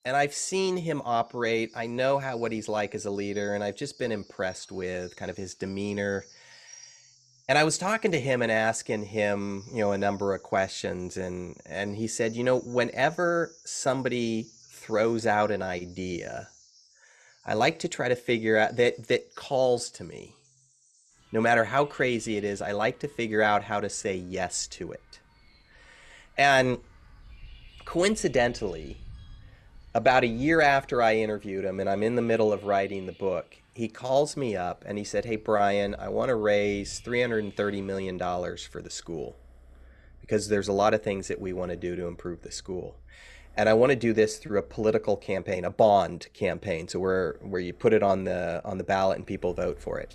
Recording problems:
animal sounds; faint; throughout; 25 dB below the speech

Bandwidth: 13.5 kHz